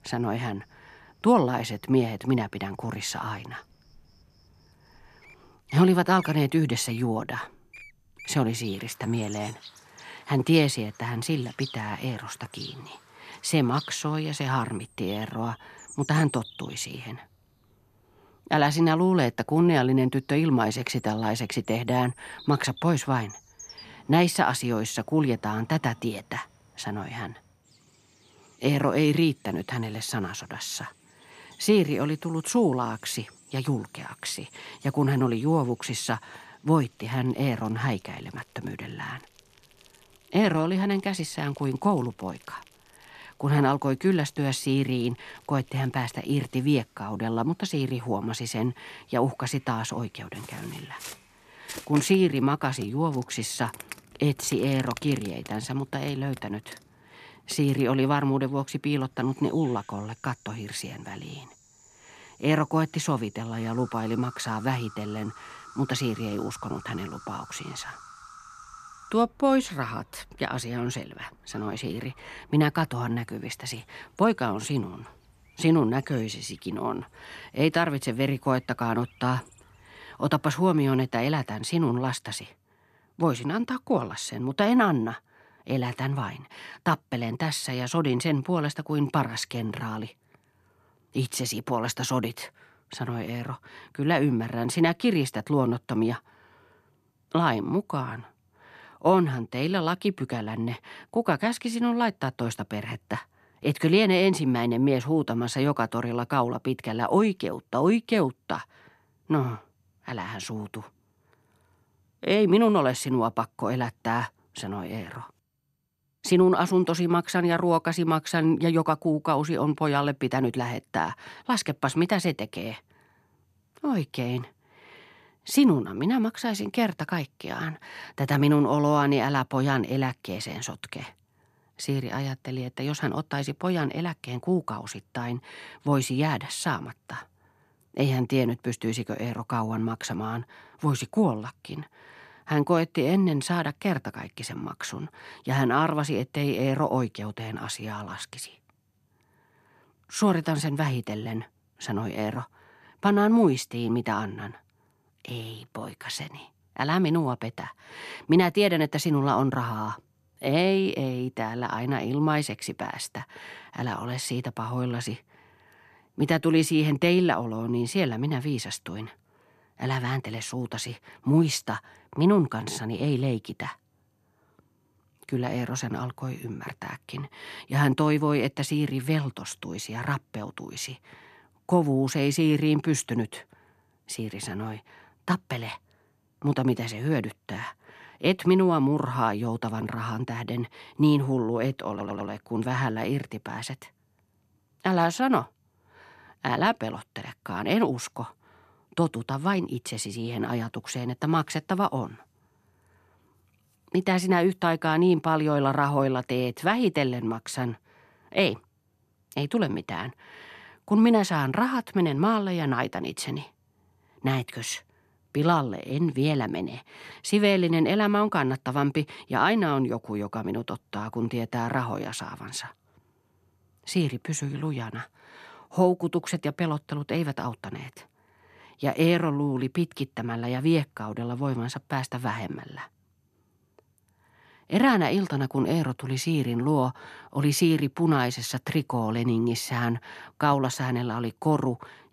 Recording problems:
animal sounds; faint; until 1:21; 20 dB below the speech
audio stuttering; at 3:12

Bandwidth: 14 kHz